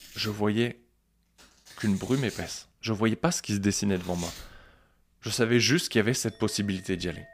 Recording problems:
household noises; noticeable; throughout; 15 dB below the speech

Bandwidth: 15 kHz